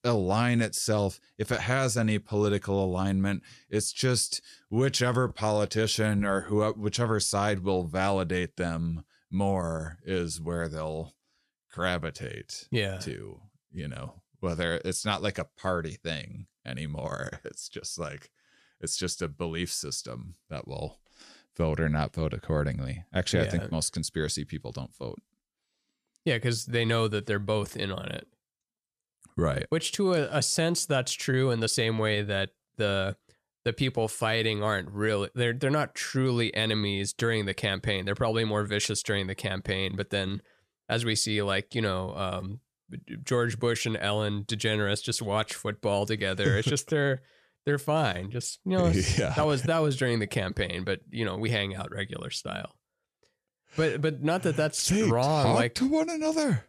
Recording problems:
none

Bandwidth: 14 kHz